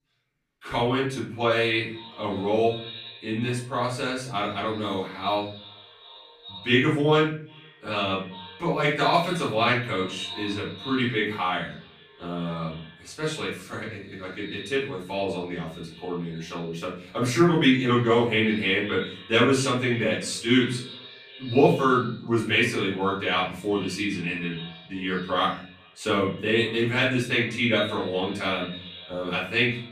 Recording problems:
off-mic speech; far
echo of what is said; noticeable; throughout; 390 ms later, 15 dB below the speech
room echo; slight; dies away in 0.4 s

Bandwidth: 15 kHz